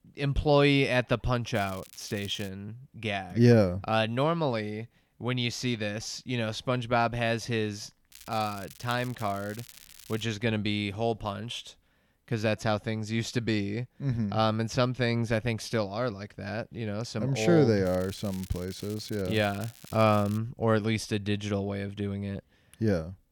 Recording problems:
crackling; noticeable; at 1.5 s, from 8 to 10 s and from 18 to 20 s; 20 dB below the speech

